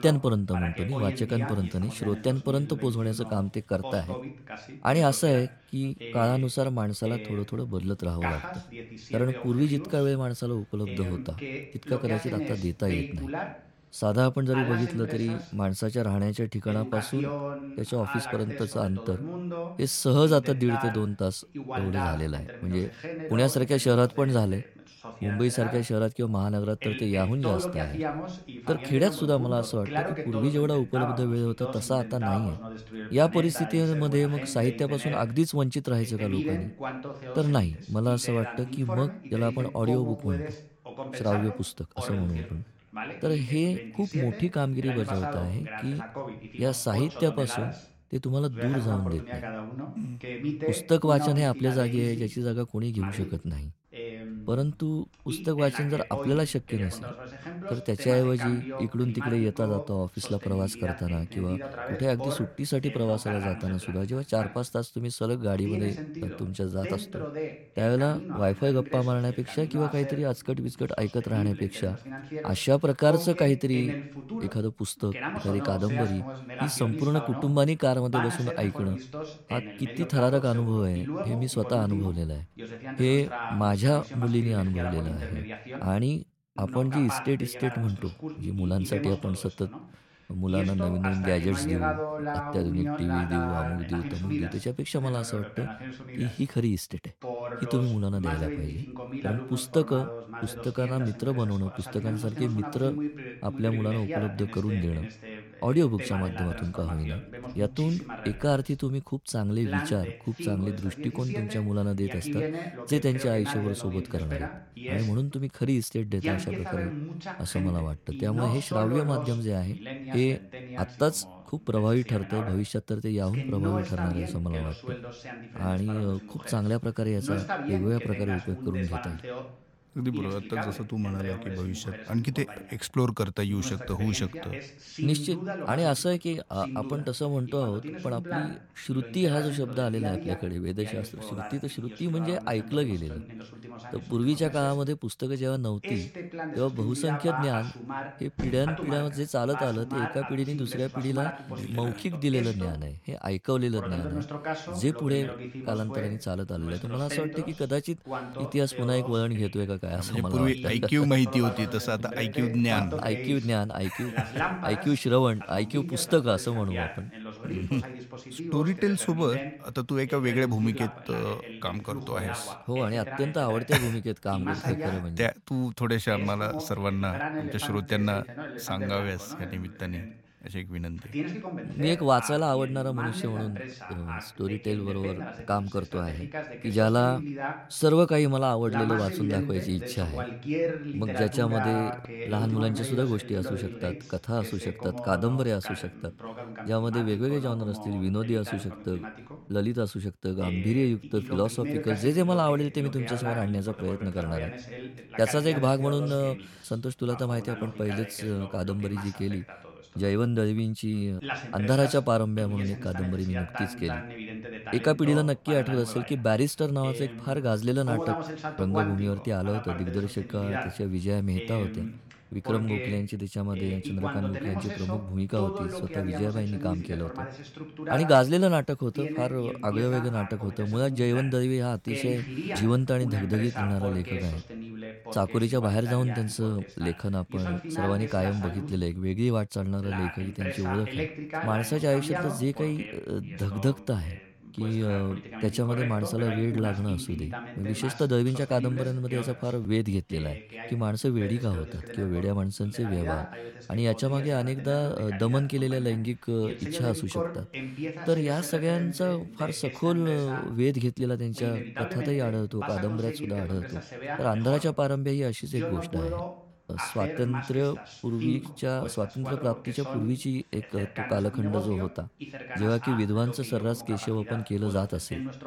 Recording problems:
voice in the background; loud; throughout; 8 dB below the speech

